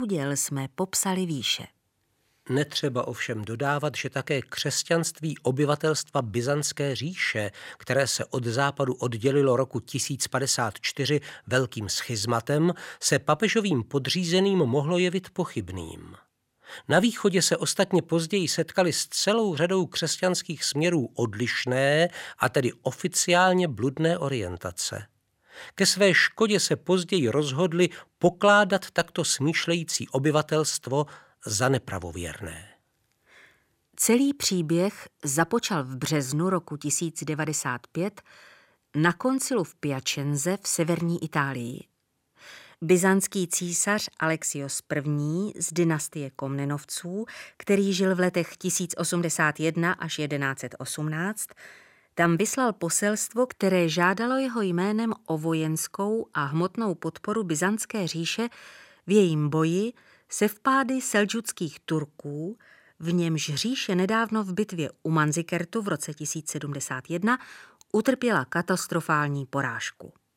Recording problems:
abrupt cut into speech; at the start

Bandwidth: 16 kHz